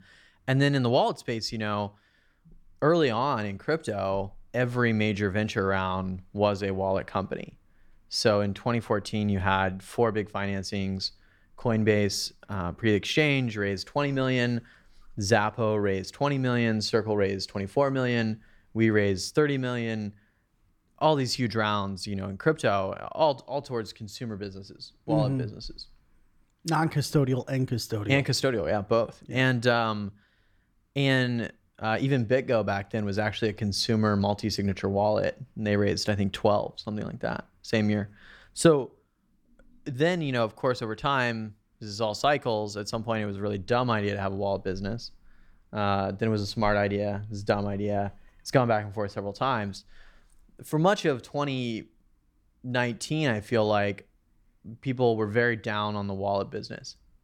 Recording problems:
none

